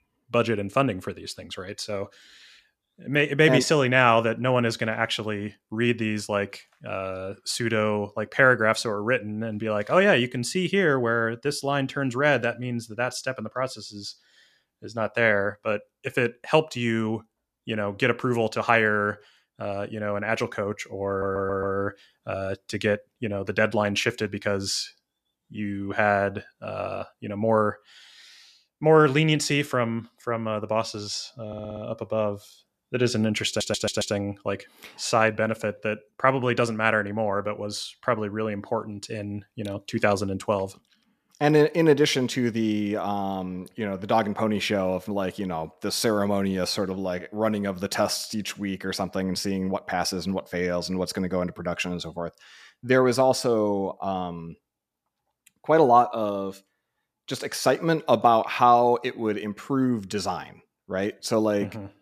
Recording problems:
audio stuttering; at 21 s, at 31 s and at 33 s

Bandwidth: 14.5 kHz